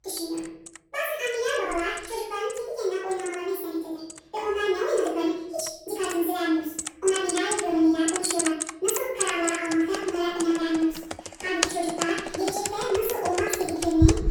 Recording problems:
off-mic speech; far
wrong speed and pitch; too fast and too high; 1.6 times normal speed
room echo; noticeable; dies away in 0.7 s
household noises; loud; throughout; 4 dB below the speech

